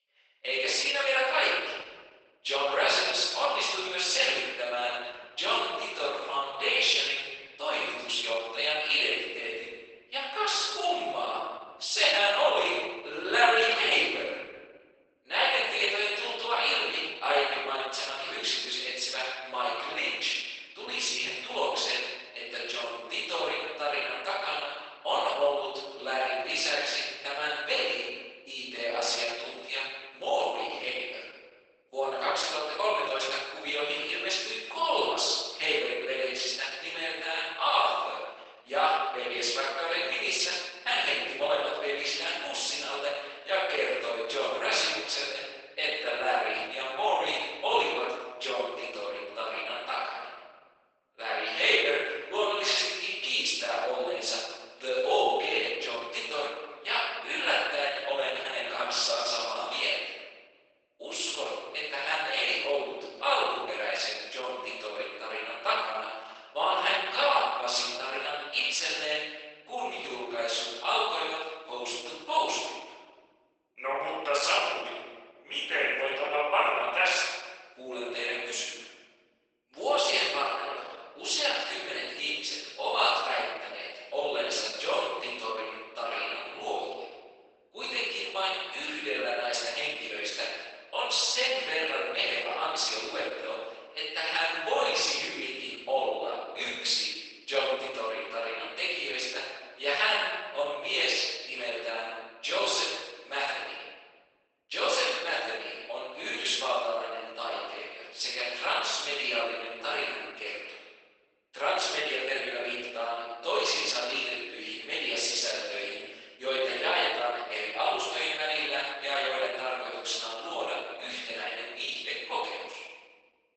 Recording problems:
room echo; strong; dies away in 1.2 s
off-mic speech; far
garbled, watery; badly; nothing above 8 kHz
thin; very; fading below 450 Hz

